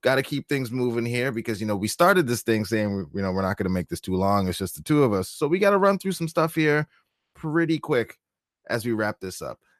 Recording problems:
none

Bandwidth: 14 kHz